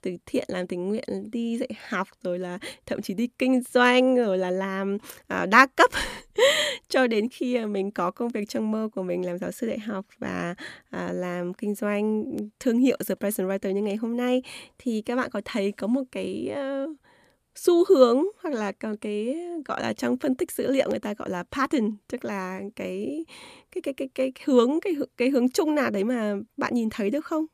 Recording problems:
none

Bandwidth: 14.5 kHz